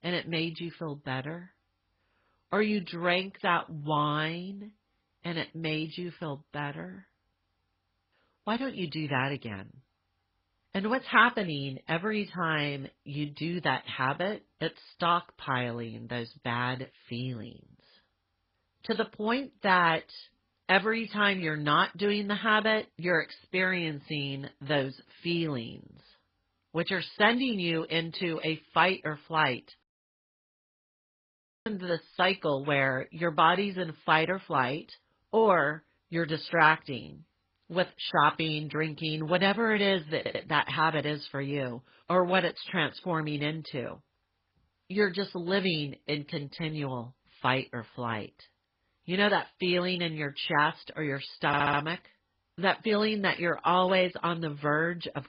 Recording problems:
garbled, watery; badly; nothing above 5 kHz
audio cutting out; at 30 s for 2 s
audio stuttering; at 40 s and at 51 s

